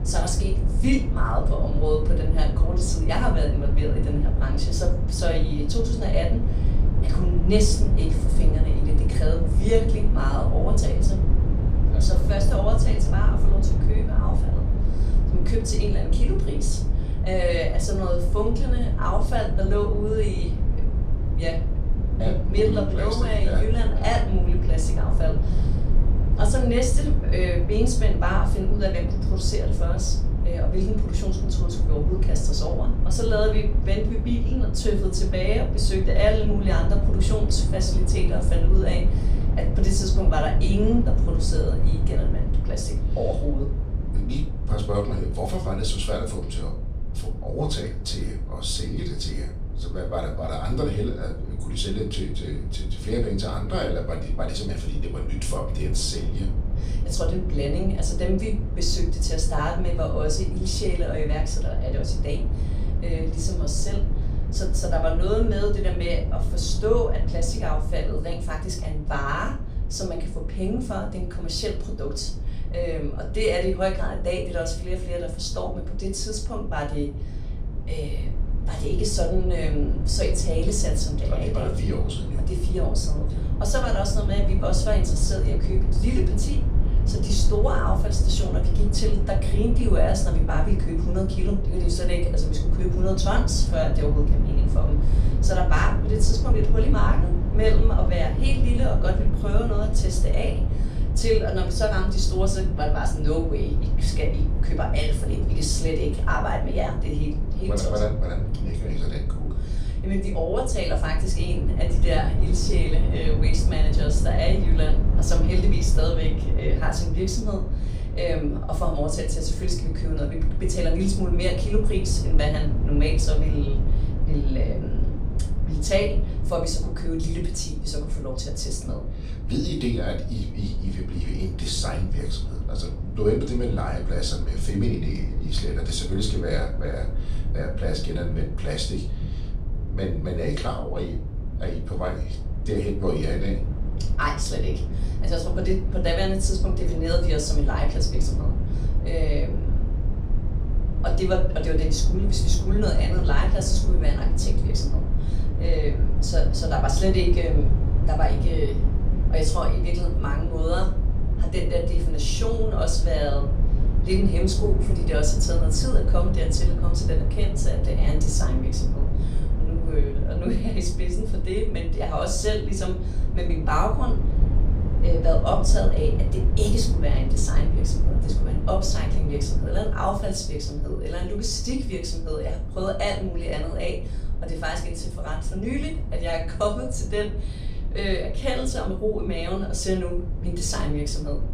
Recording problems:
off-mic speech; far
room echo; slight; dies away in 0.3 s
low rumble; loud; throughout; 10 dB below the speech

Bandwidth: 15.5 kHz